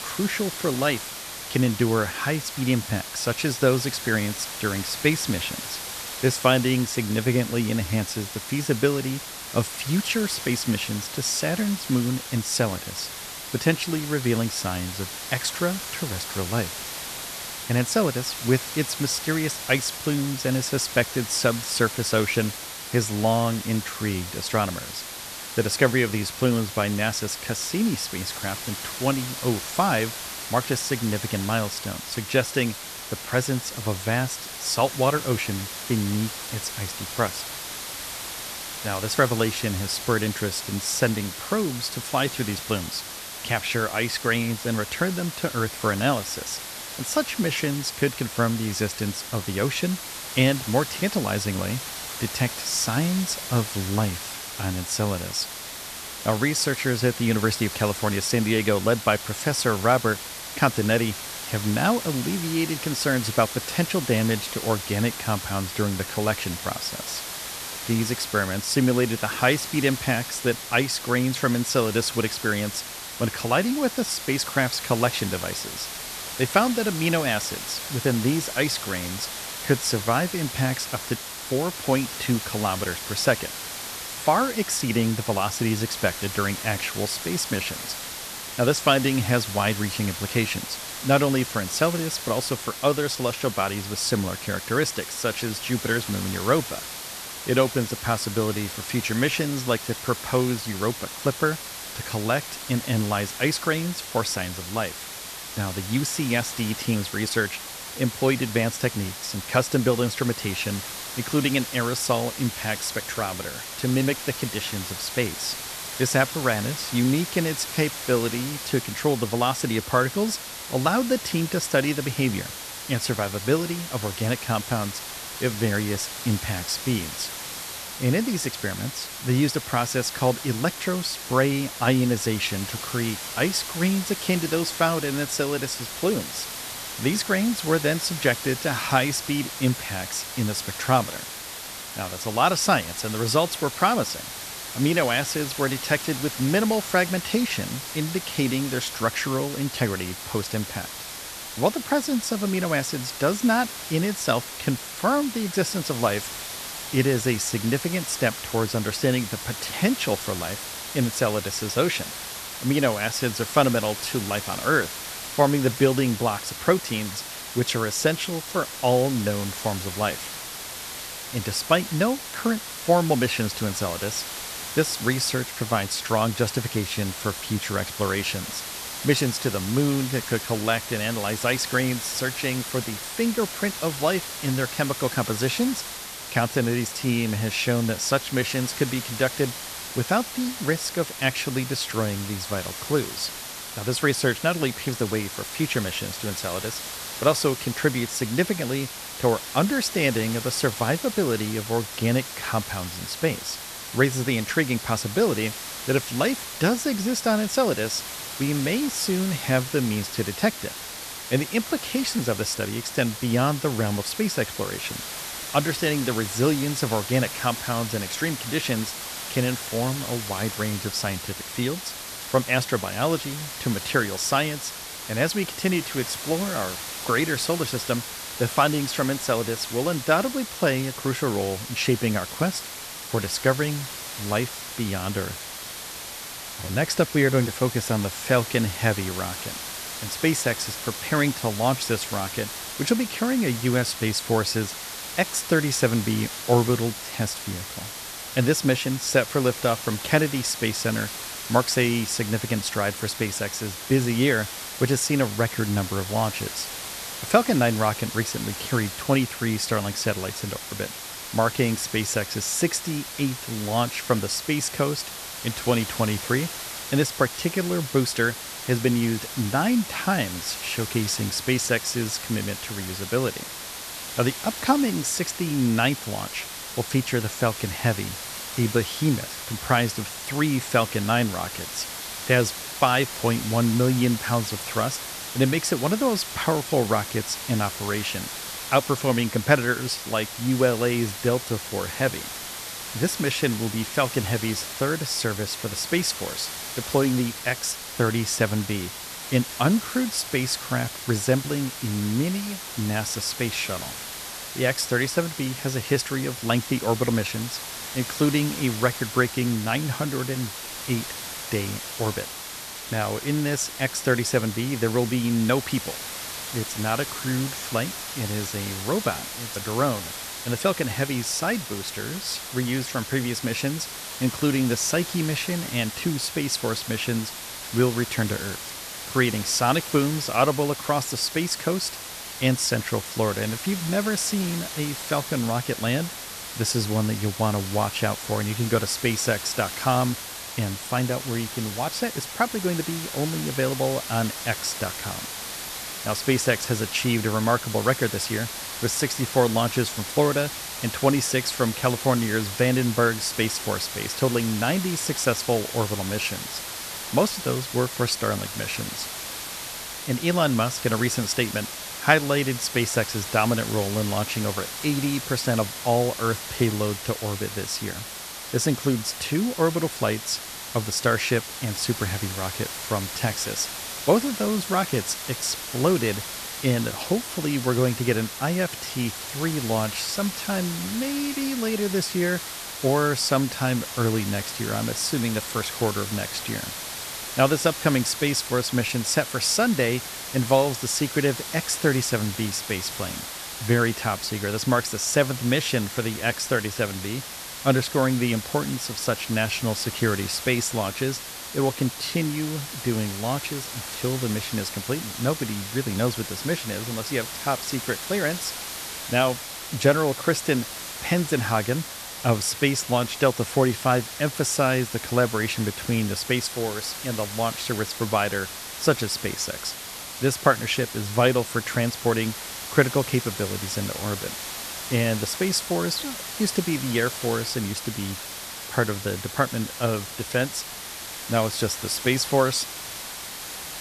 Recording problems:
hiss; loud; throughout; 7 dB below the speech

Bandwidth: 14 kHz